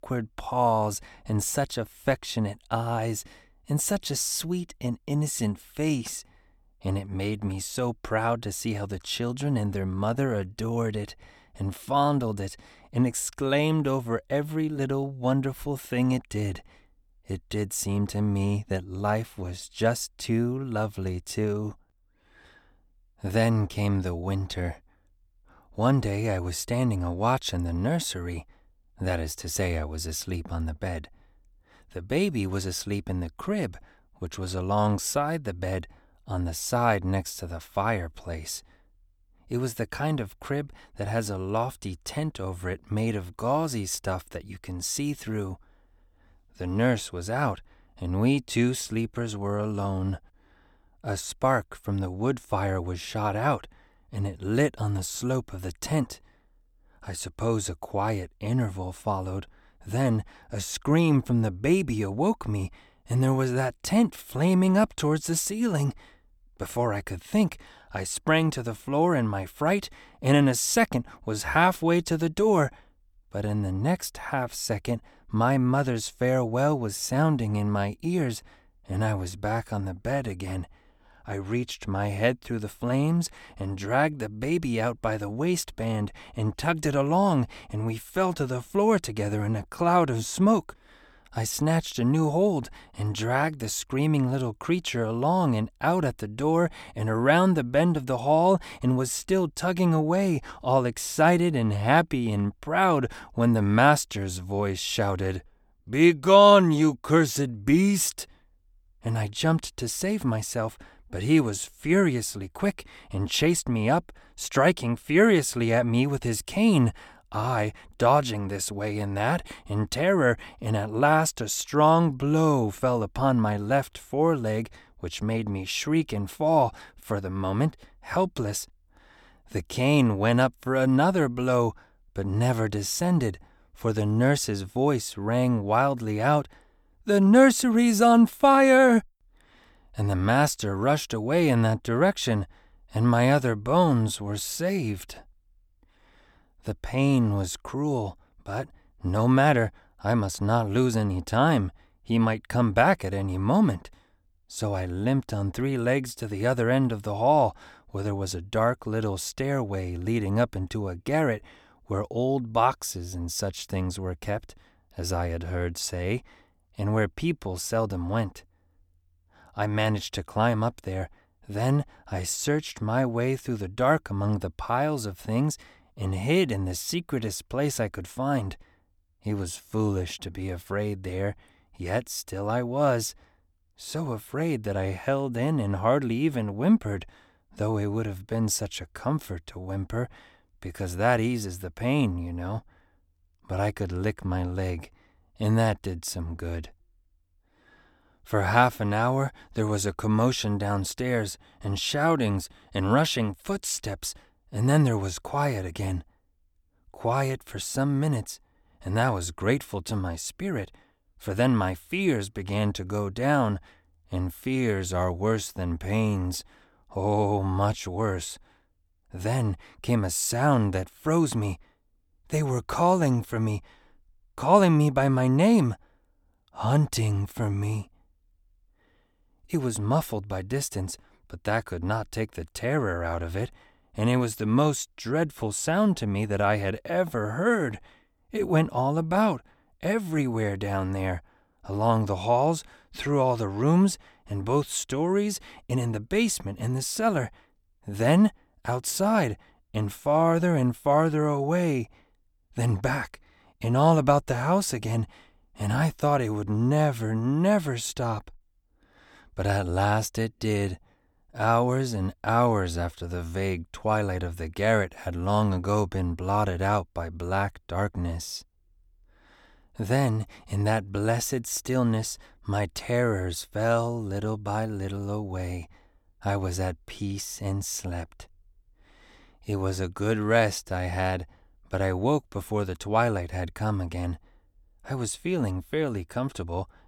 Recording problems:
none

